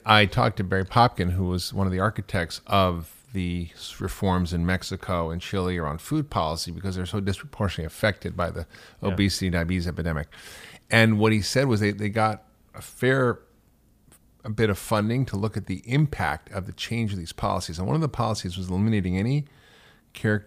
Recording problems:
none

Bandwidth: 15 kHz